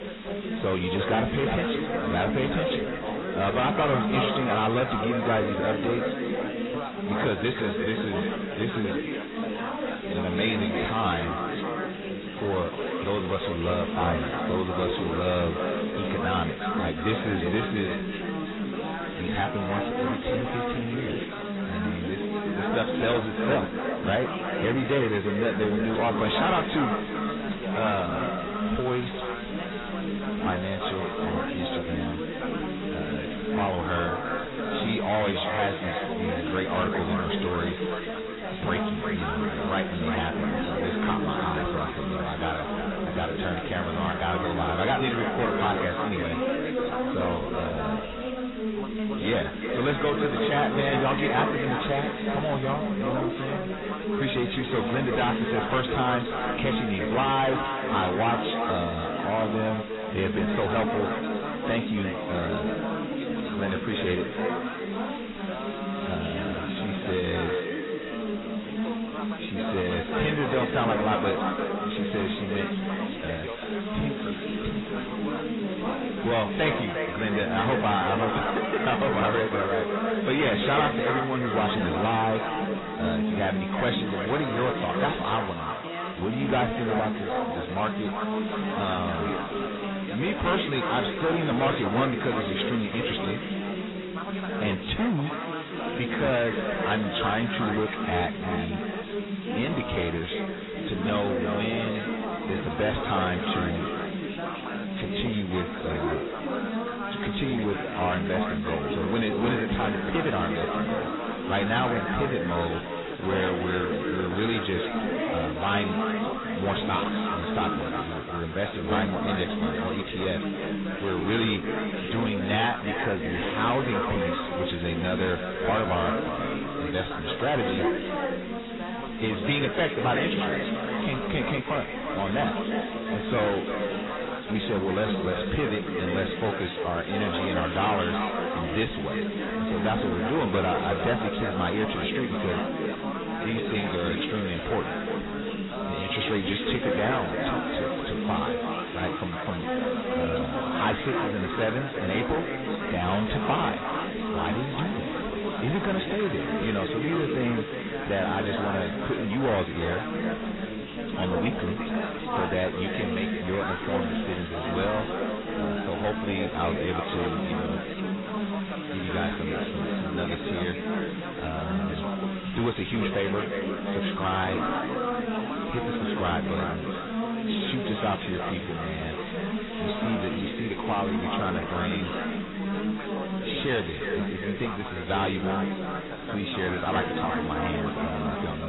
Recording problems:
distortion; heavy; 7 dB below the speech
echo of what is said; strong; throughout; 350 ms later, 8 dB below the speech
garbled, watery; badly; nothing above 4 kHz
background chatter; loud; throughout; 3 voices, 3 dB below the speech
hiss; noticeable; throughout; 15 dB below the speech
abrupt cut into speech; at the end

